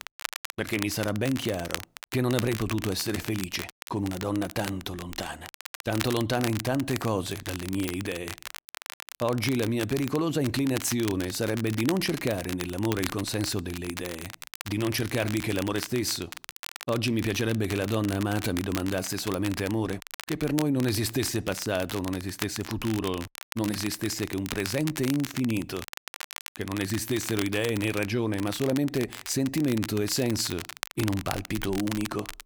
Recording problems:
crackle, like an old record; loud; 10 dB below the speech

